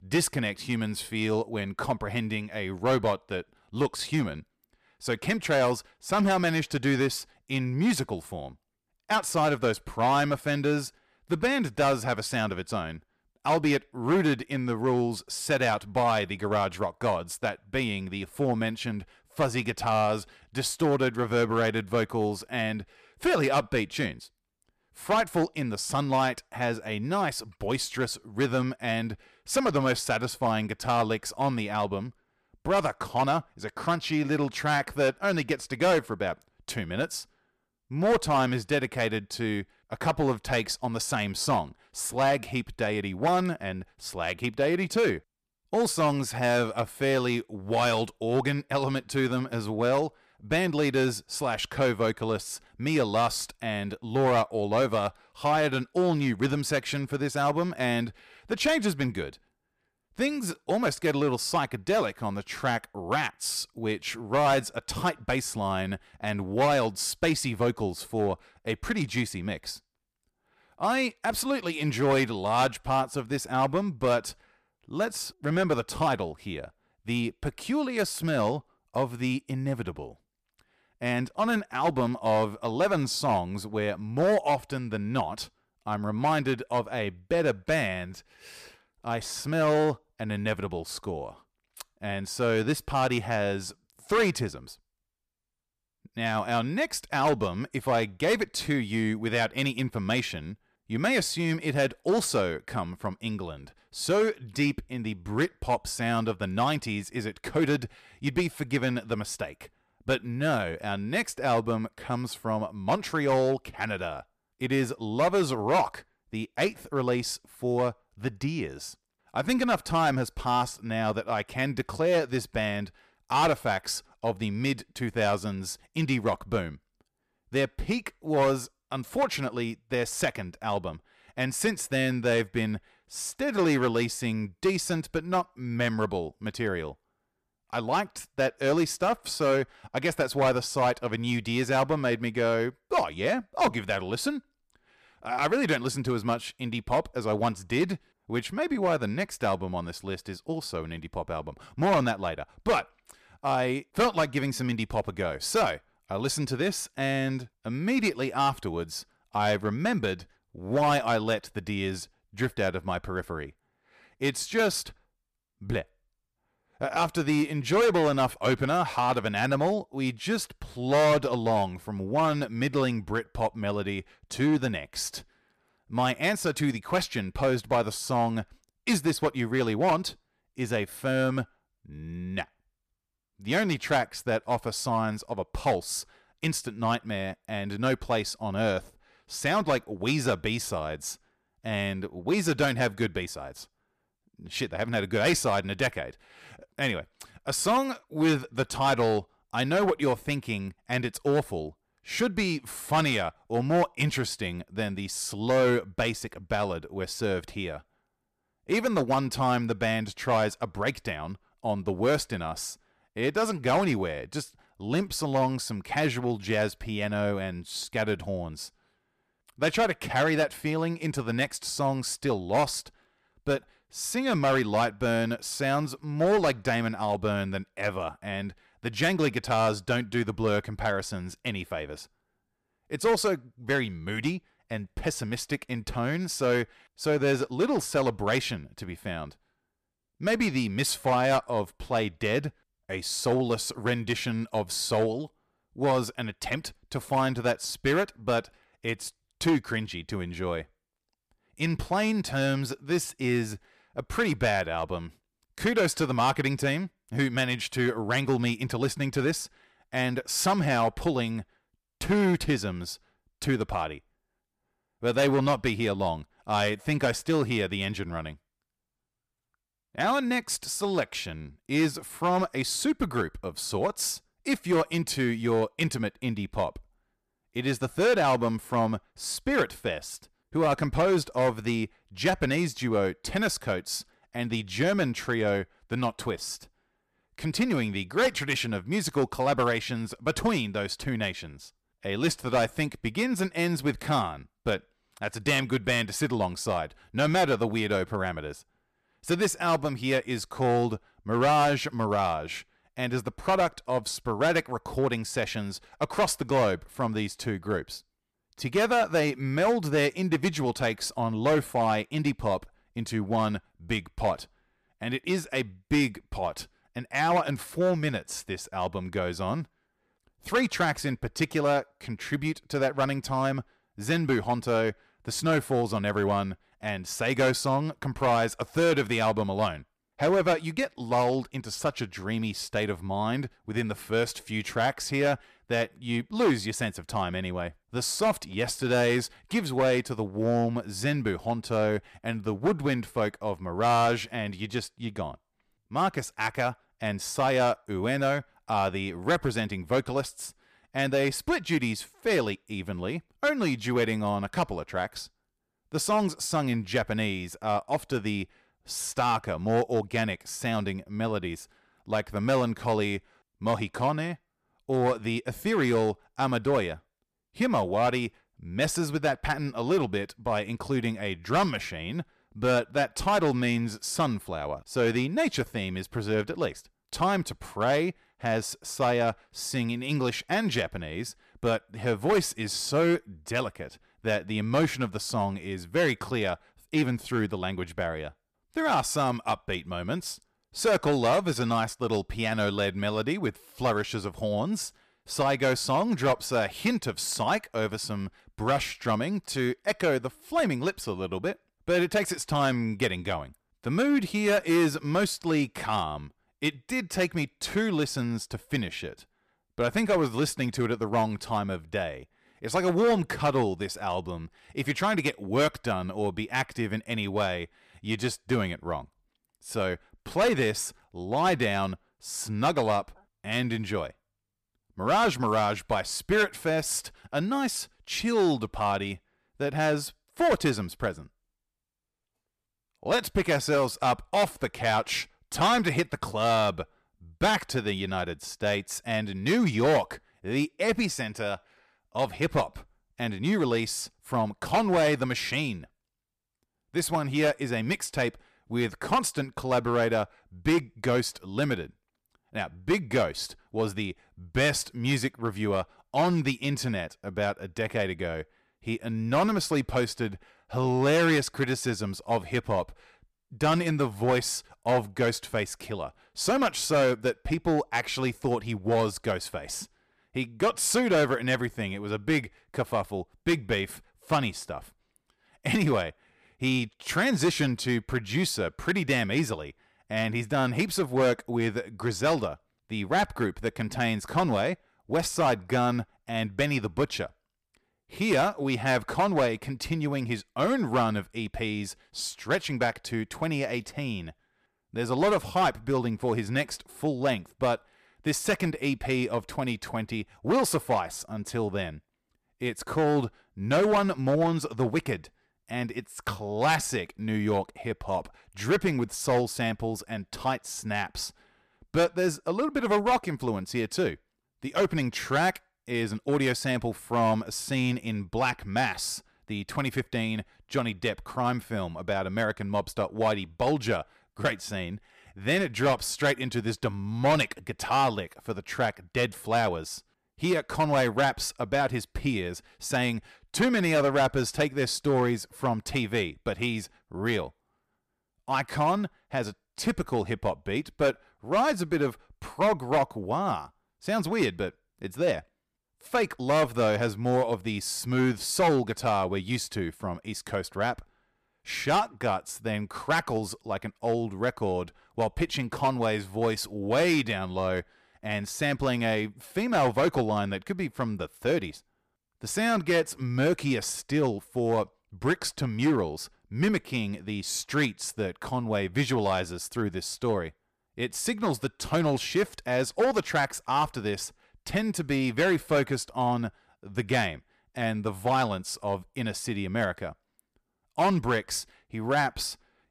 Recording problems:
distortion; slight; 4% of the sound clipped

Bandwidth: 14.5 kHz